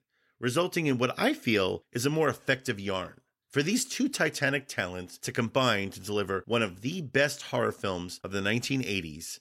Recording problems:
none

